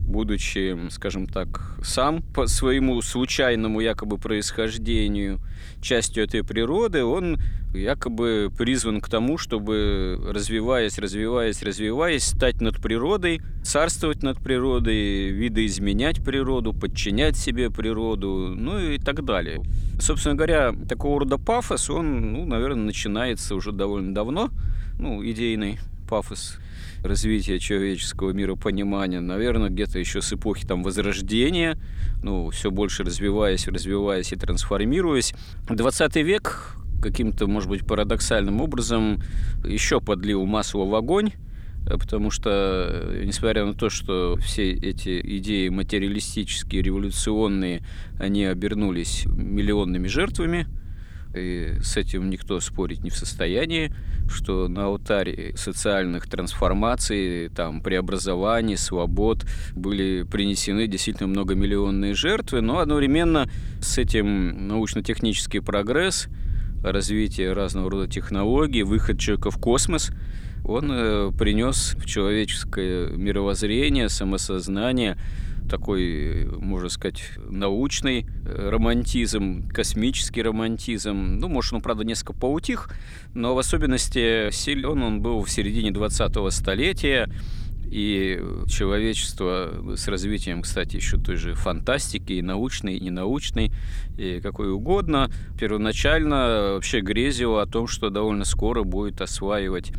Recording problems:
low rumble; faint; throughout; 25 dB below the speech

